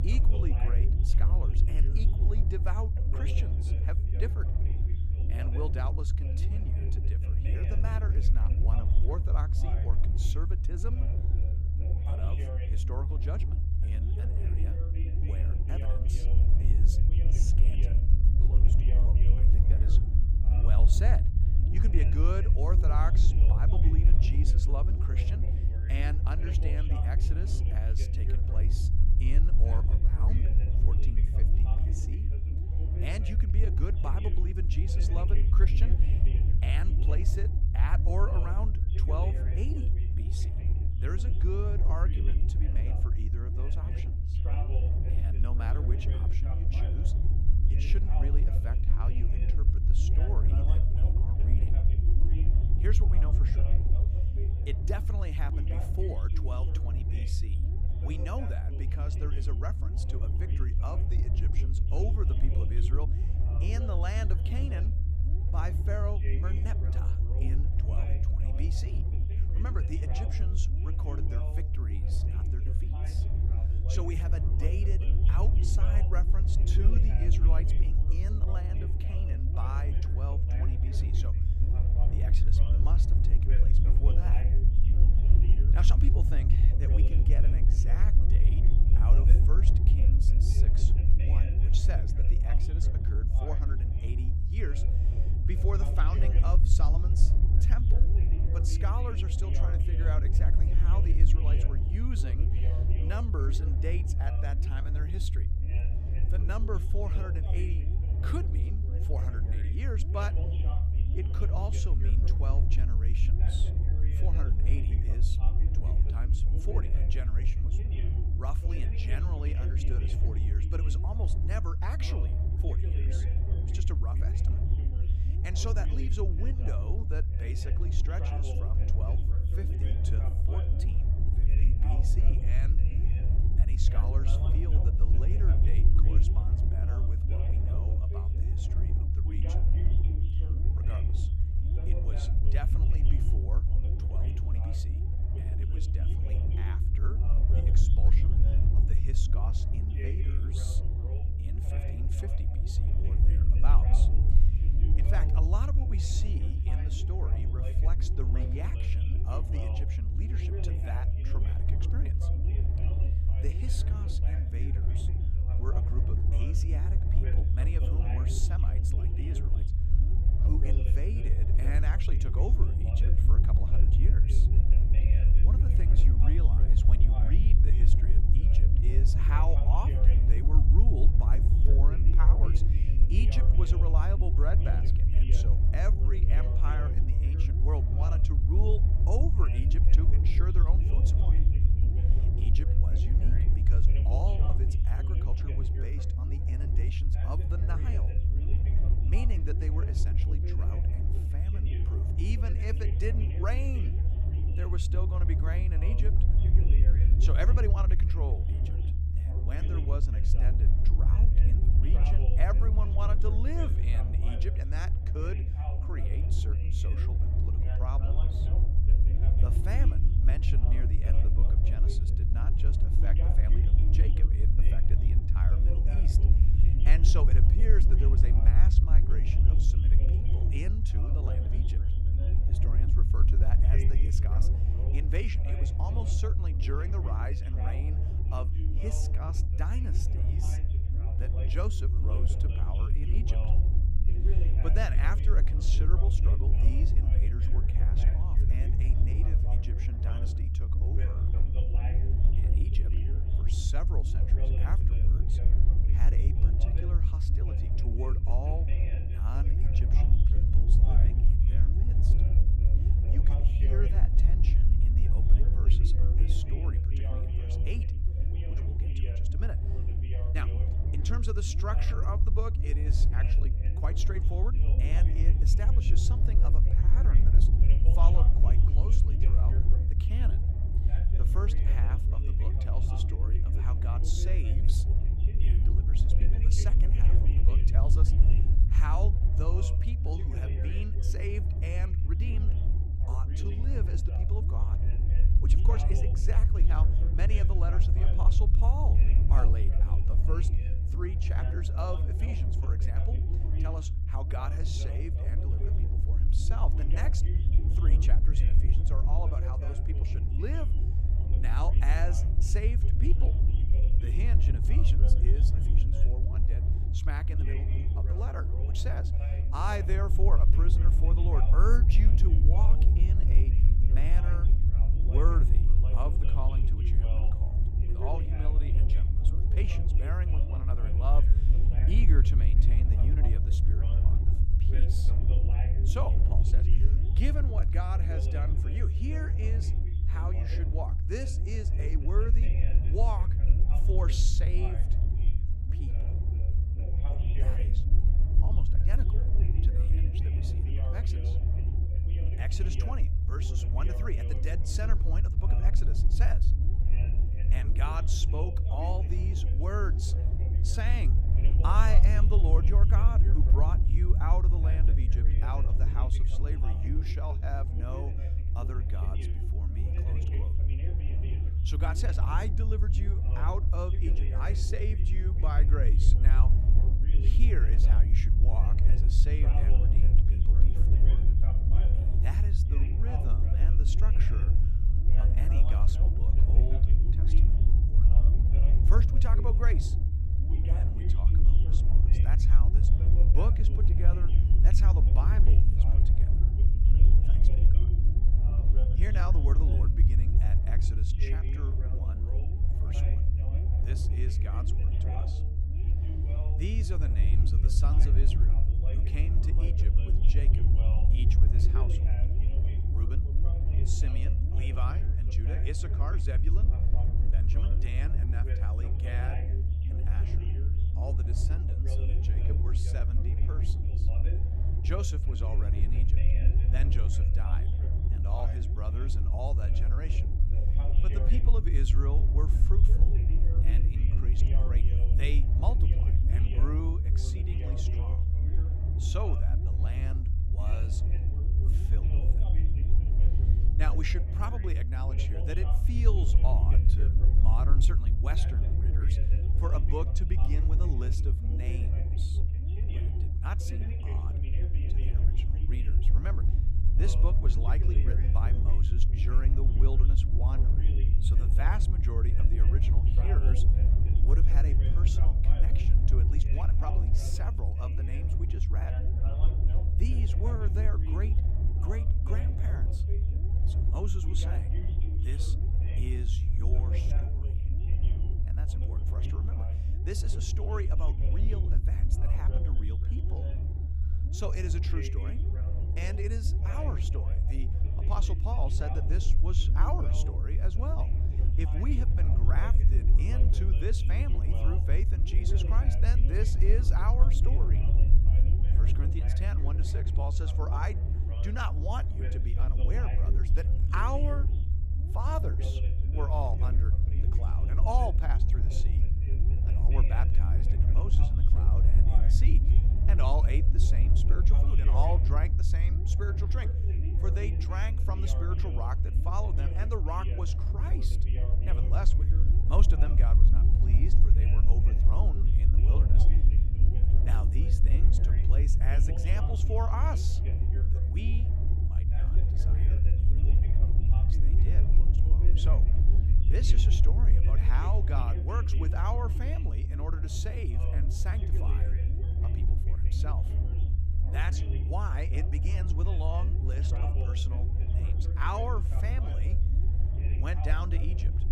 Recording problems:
voice in the background; loud; throughout; 8 dB below the speech
low rumble; loud; throughout; 3 dB below the speech

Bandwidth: 15.5 kHz